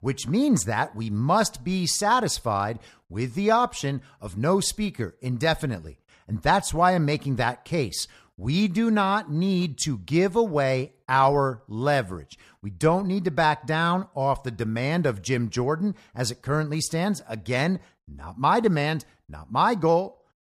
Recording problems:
none

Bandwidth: 14.5 kHz